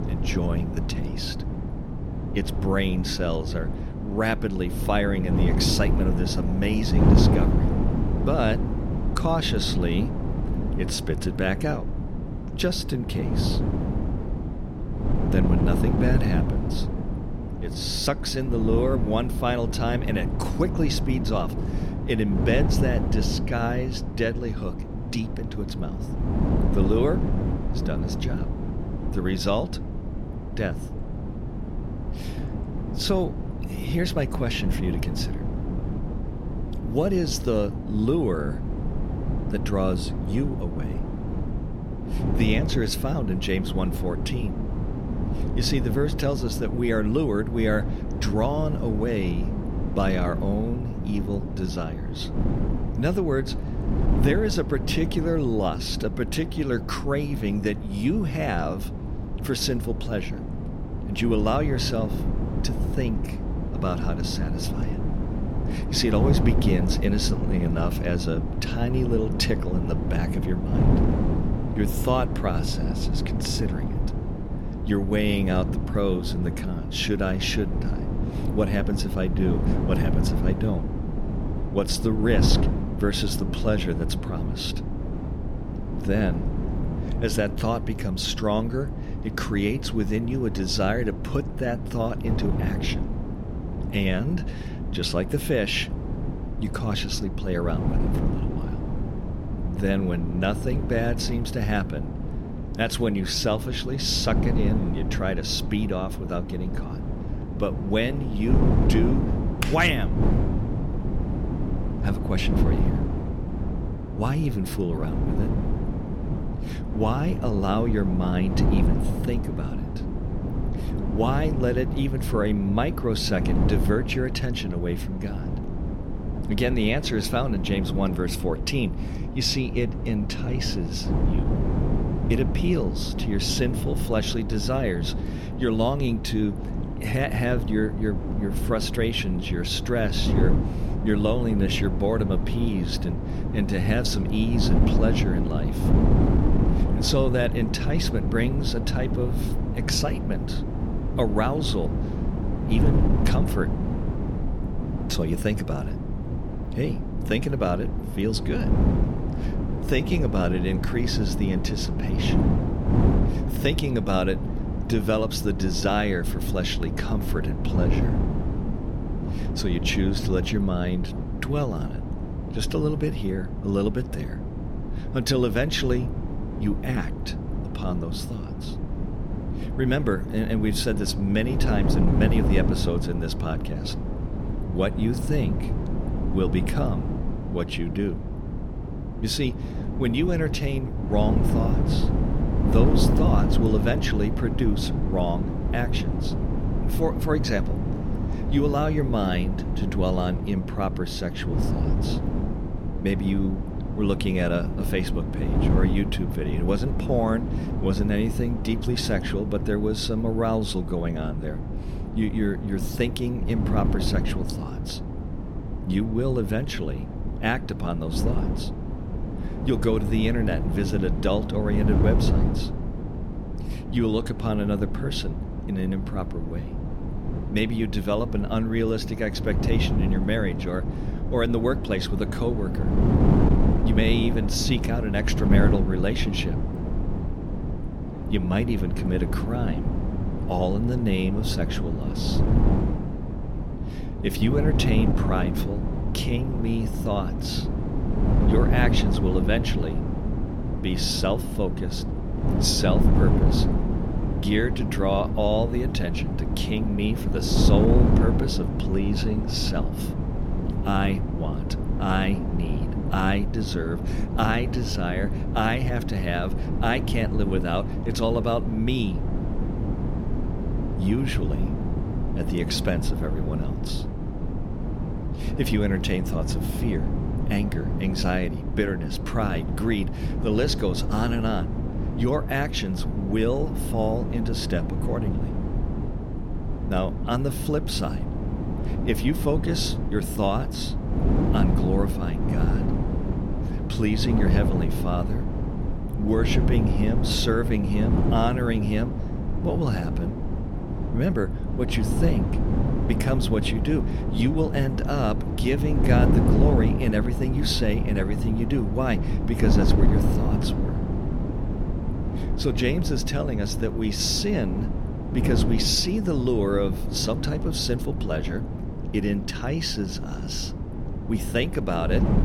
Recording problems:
wind noise on the microphone; heavy; 6 dB below the speech

